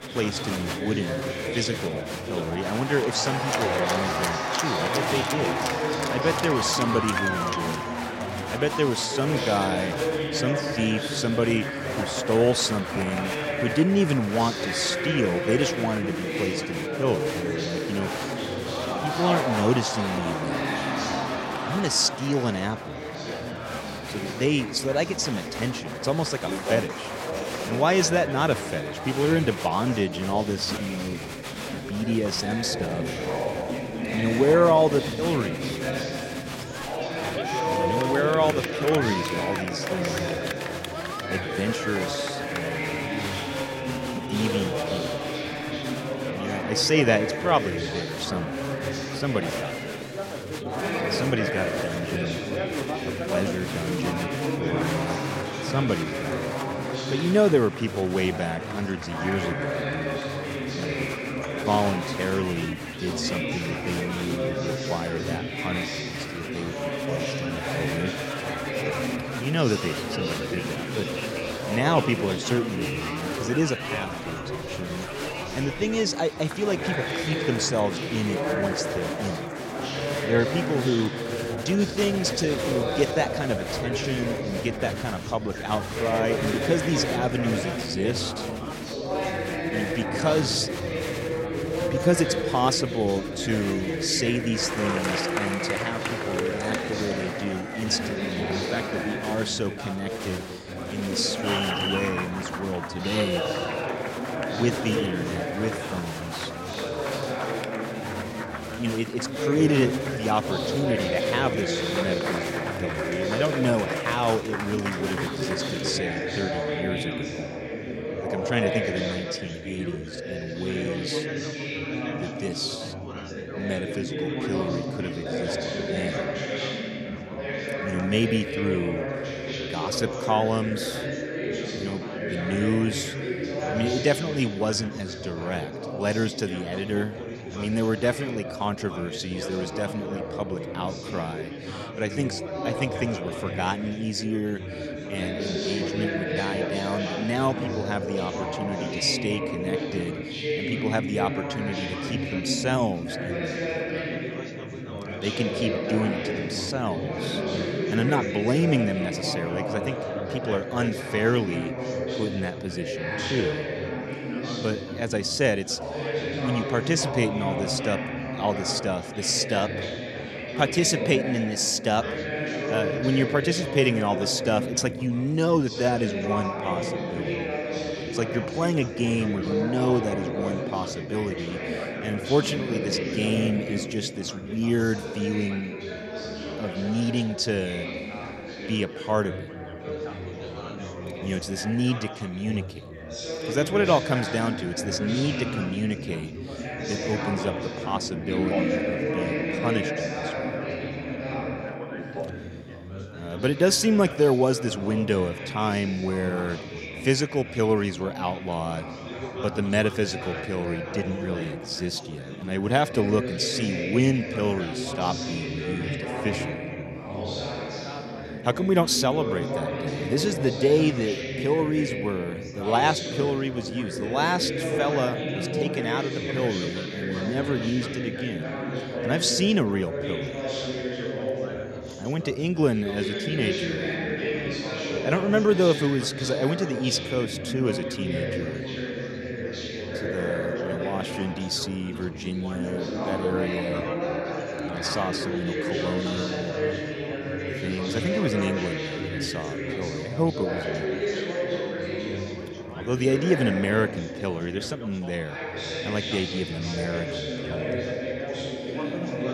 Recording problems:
chatter from many people; loud; throughout; 3 dB below the speech

